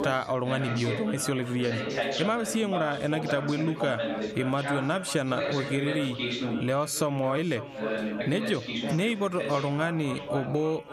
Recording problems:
echo of what is said; noticeable; throughout; 550 ms later, 15 dB below the speech
squashed, flat; somewhat, background pumping
background chatter; loud; throughout; 2 voices, 5 dB below the speech

